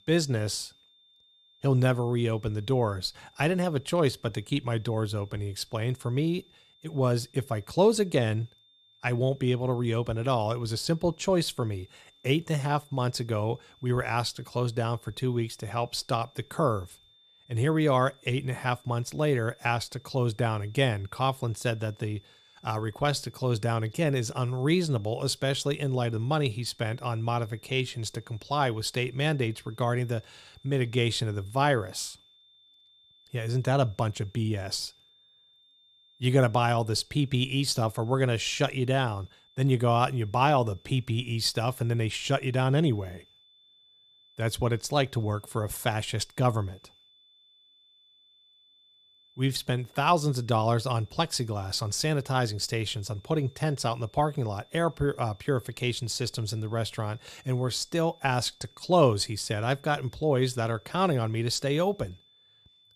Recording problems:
high-pitched whine; faint; throughout; 3.5 kHz, 30 dB below the speech

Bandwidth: 14.5 kHz